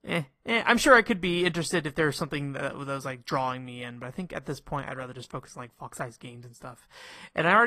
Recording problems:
garbled, watery; slightly; nothing above 14.5 kHz
abrupt cut into speech; at the end

